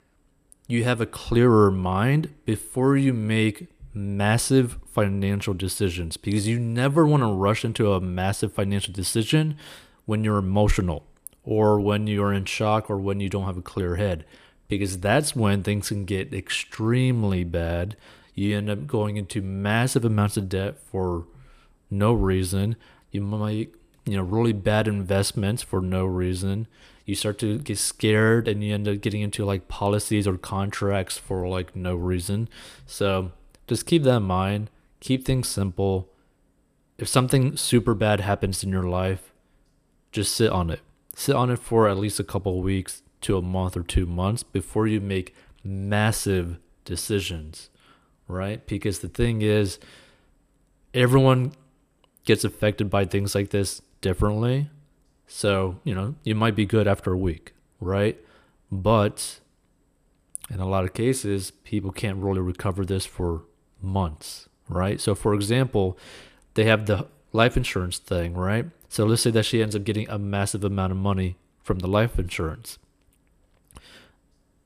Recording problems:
none

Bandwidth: 14.5 kHz